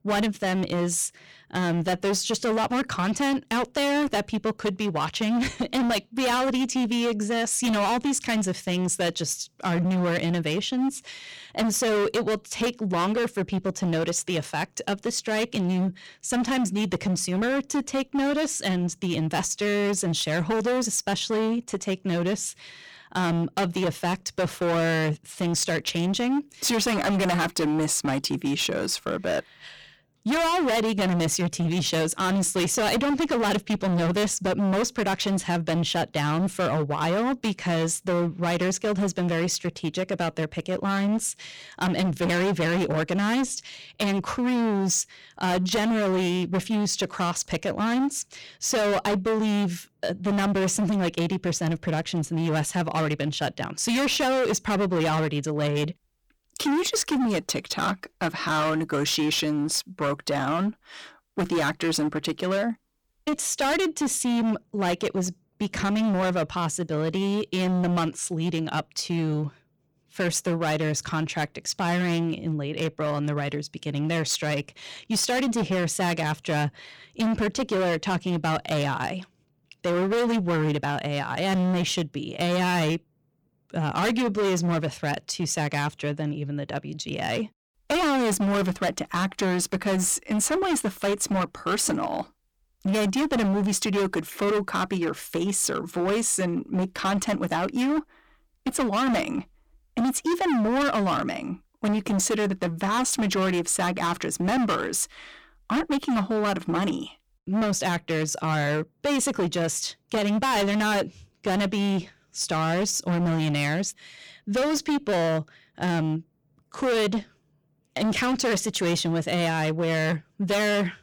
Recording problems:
distortion; heavy; 23% of the sound clipped

